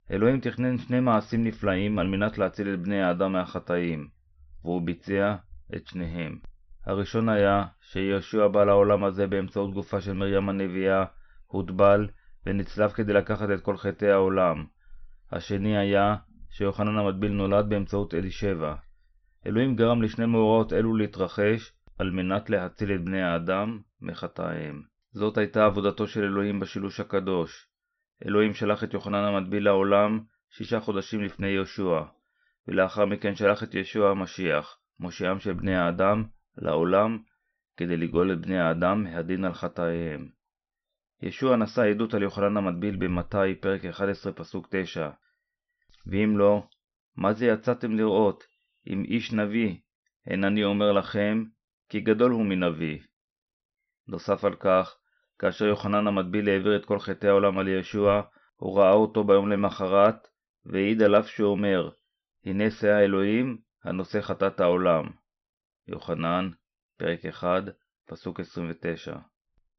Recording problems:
high frequencies cut off; noticeable; nothing above 6 kHz

